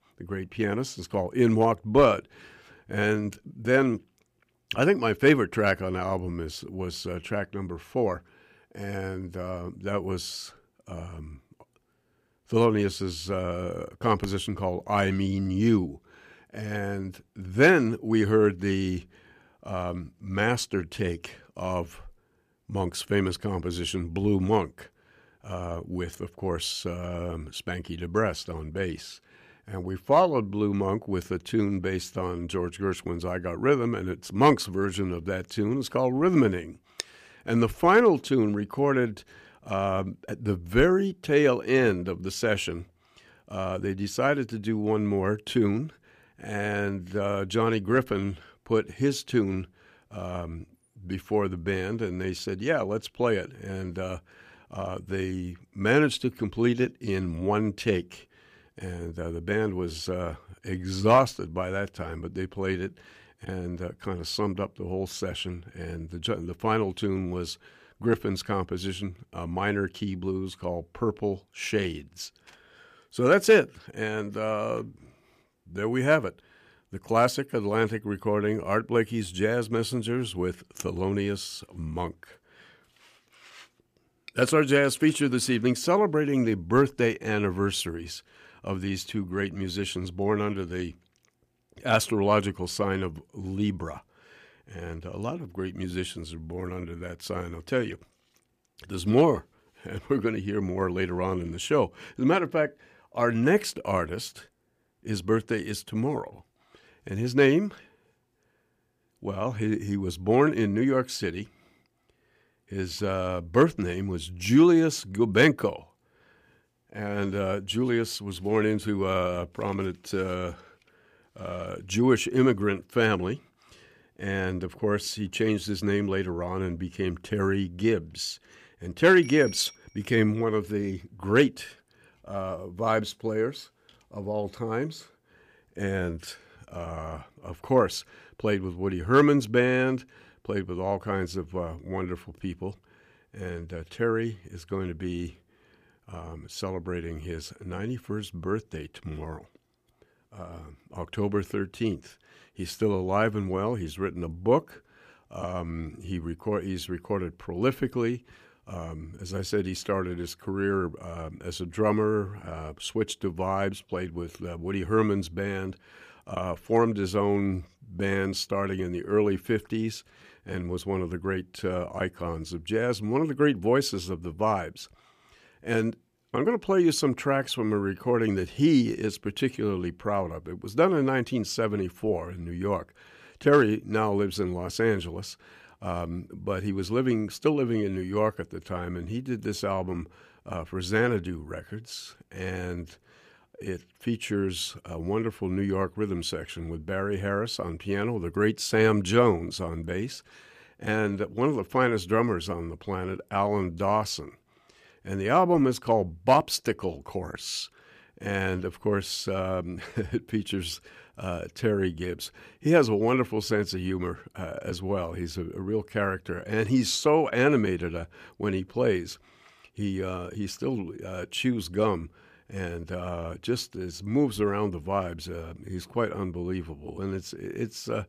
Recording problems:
none

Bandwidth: 15 kHz